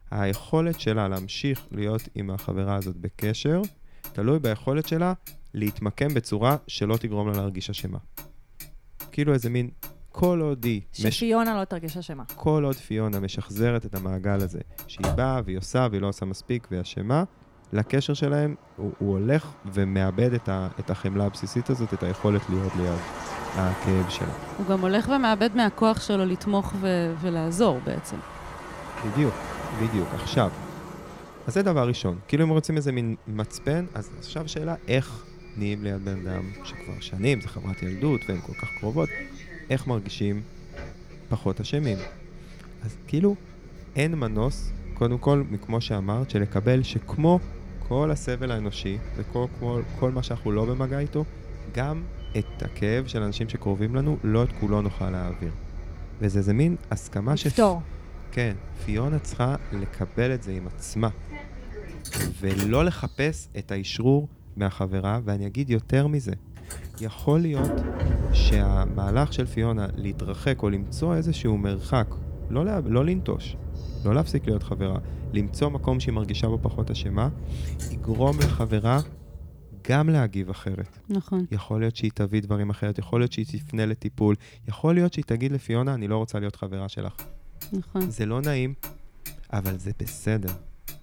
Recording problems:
traffic noise; noticeable; throughout; 10 dB below the speech

